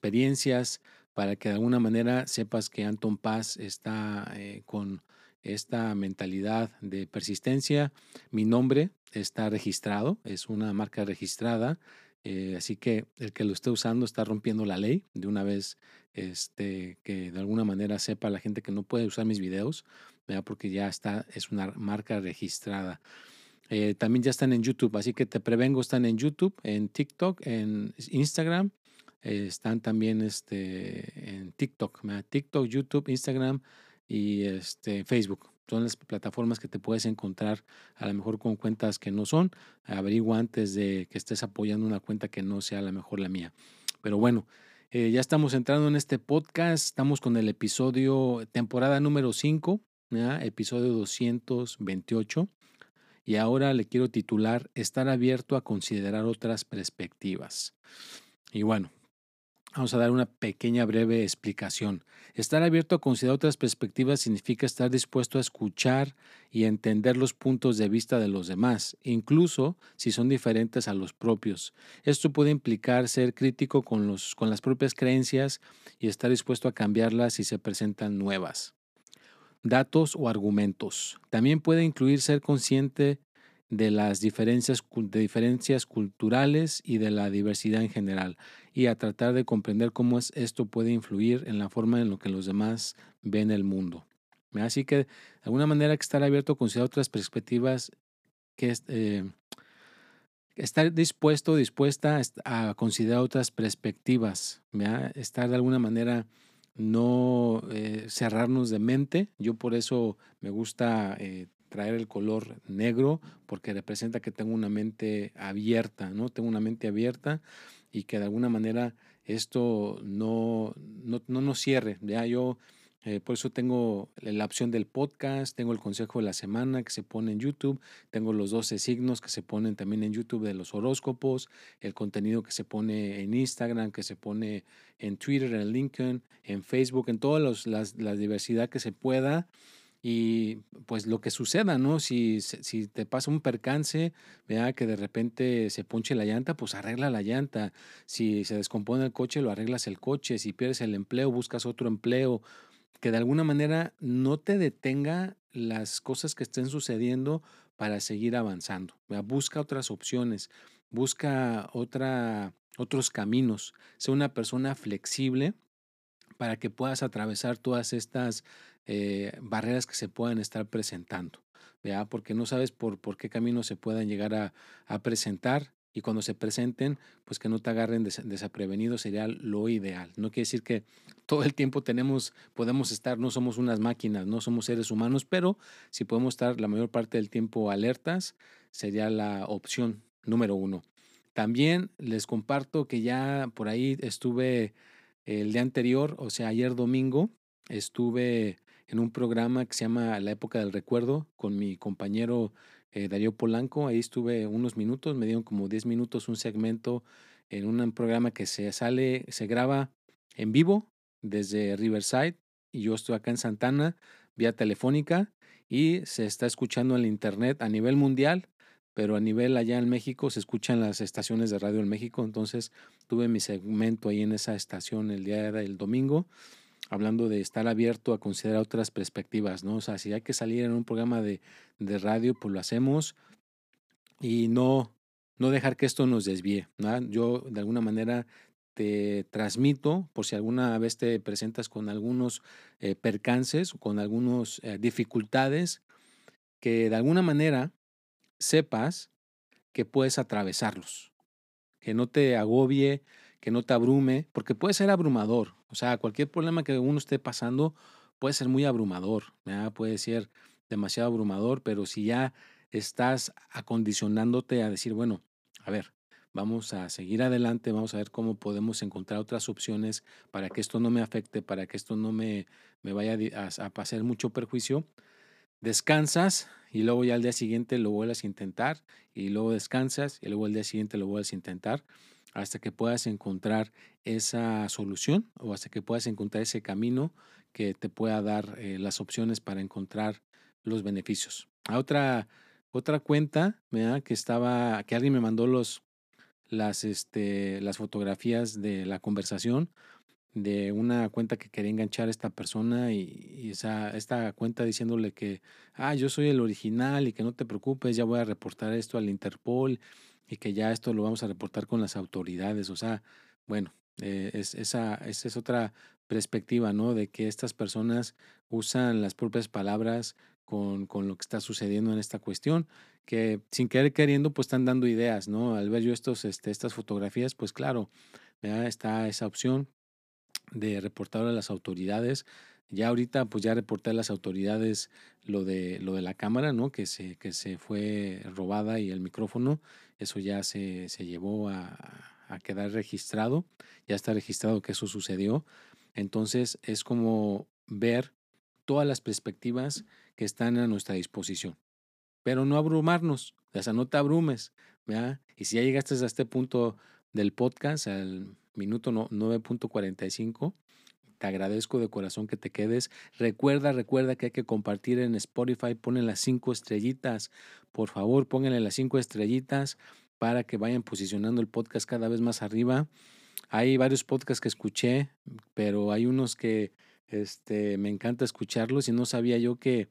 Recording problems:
none

